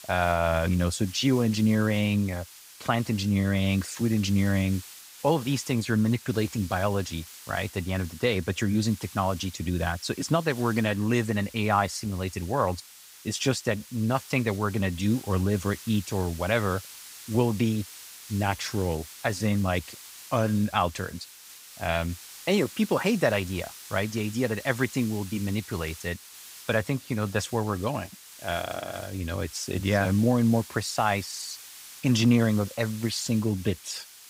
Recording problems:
hiss; noticeable; throughout; 15 dB below the speech

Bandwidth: 15.5 kHz